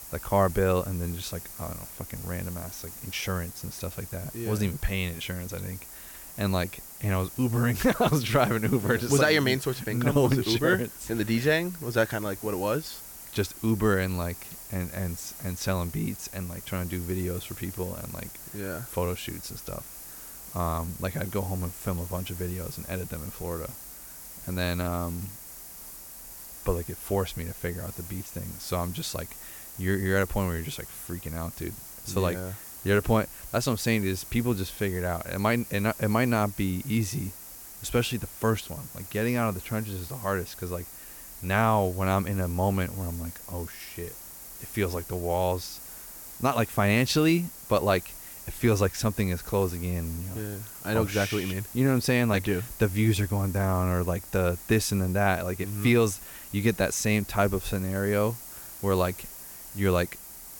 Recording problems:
hiss; noticeable; throughout; 10 dB below the speech

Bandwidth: 17 kHz